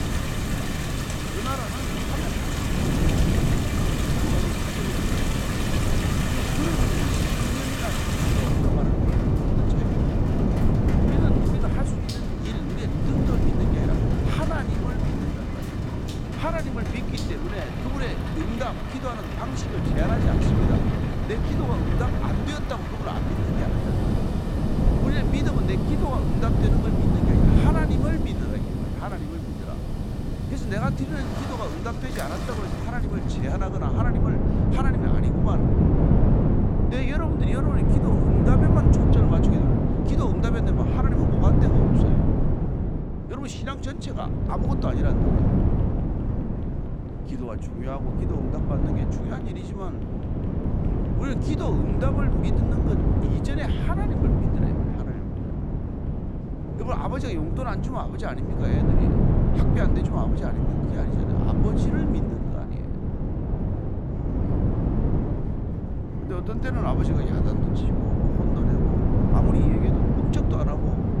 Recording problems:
rain or running water; very loud; until 33 s; as loud as the speech
wind noise on the microphone; heavy; 2 dB above the speech
chatter from many people; faint; throughout; 20 dB below the speech

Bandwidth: 16.5 kHz